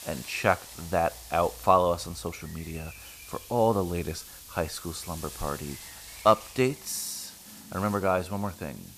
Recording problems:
hiss; noticeable; throughout; 15 dB below the speech
animal sounds; faint; throughout; 25 dB below the speech

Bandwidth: 14.5 kHz